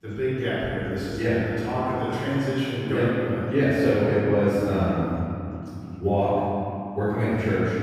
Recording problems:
room echo; strong; dies away in 2.9 s
off-mic speech; far
chatter from many people; faint; throughout; 30 dB below the speech

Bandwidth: 15 kHz